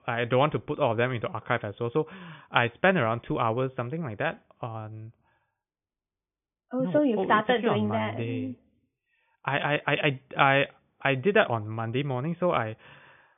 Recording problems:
high frequencies cut off; severe; nothing above 3.5 kHz

